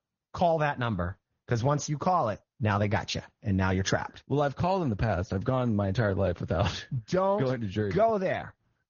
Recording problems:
high frequencies cut off; noticeable; nothing above 6.5 kHz
garbled, watery; slightly

